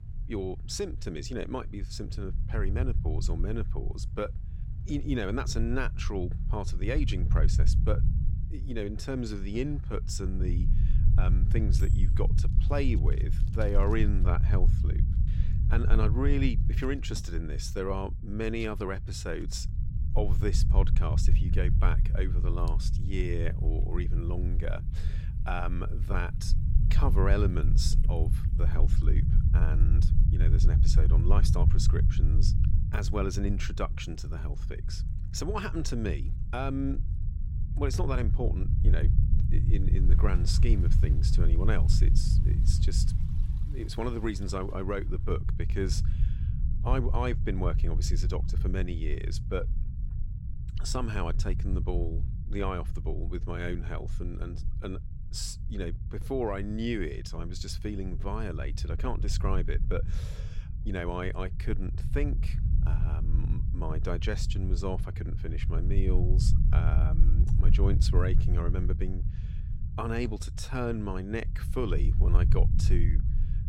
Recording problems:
low rumble; loud; throughout; 9 dB below the speech
household noises; faint; until 49 s; 30 dB below the speech

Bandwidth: 16 kHz